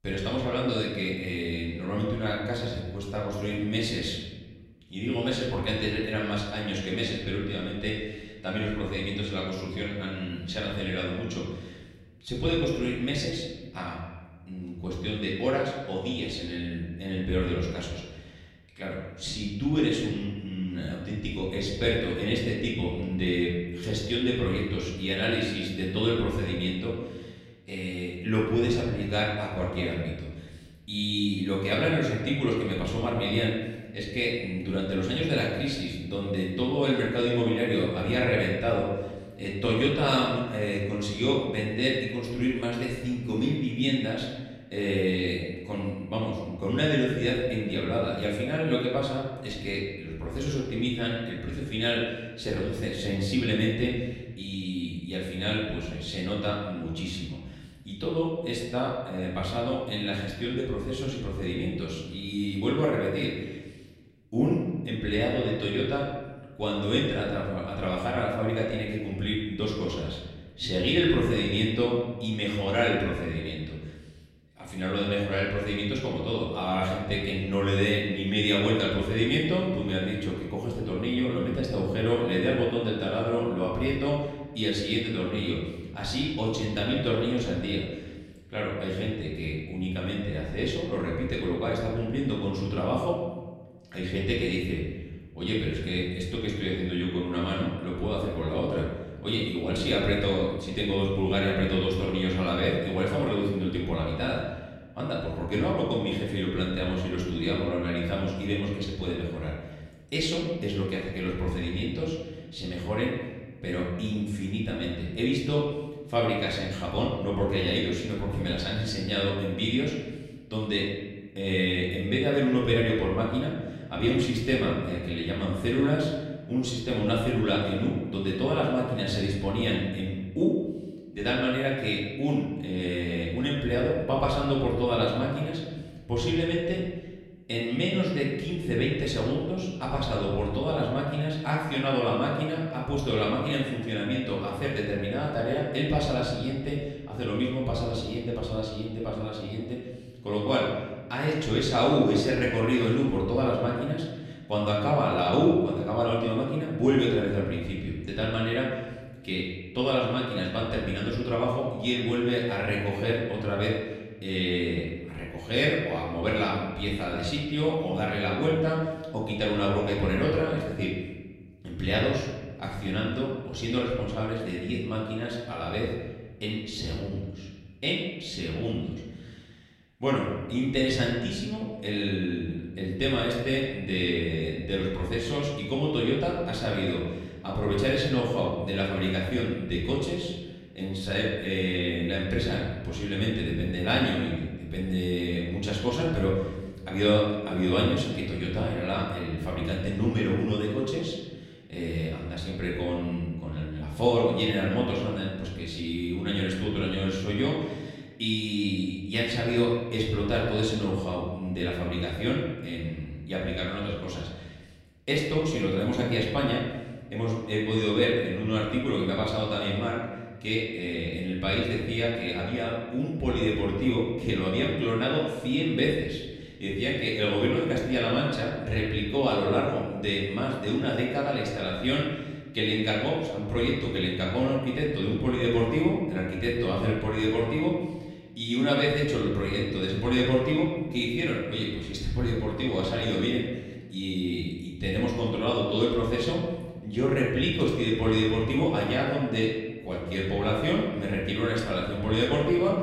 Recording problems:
off-mic speech; far
room echo; noticeable; dies away in 1.2 s

